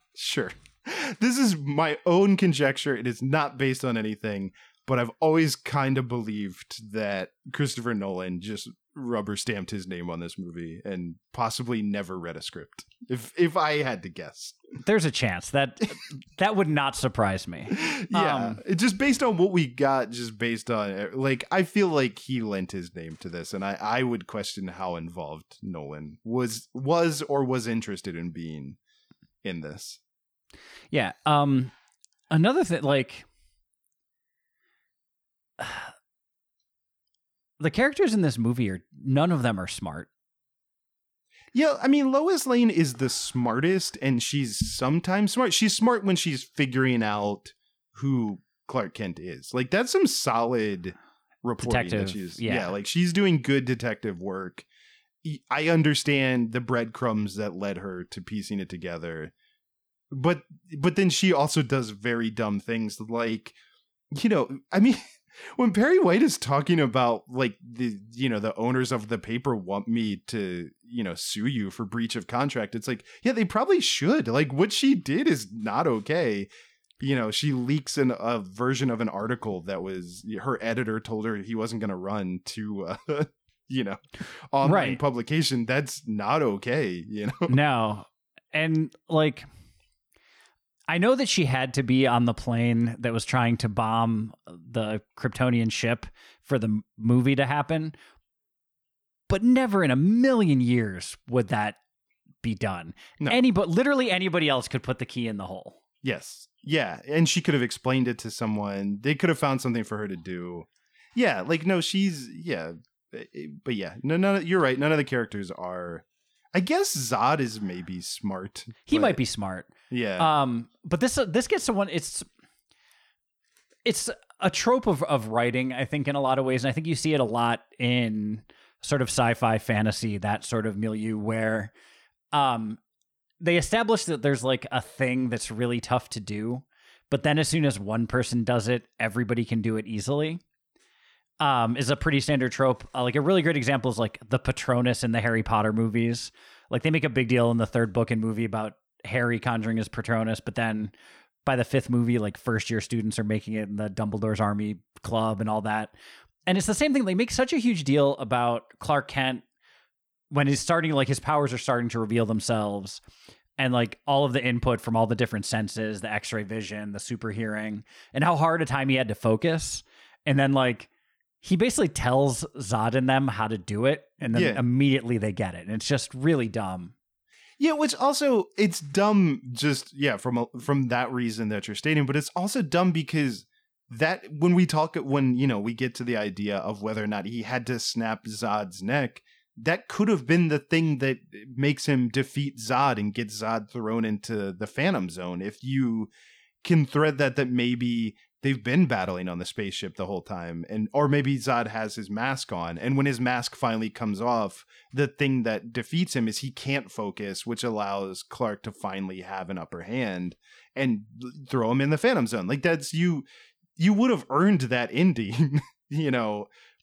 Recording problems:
none

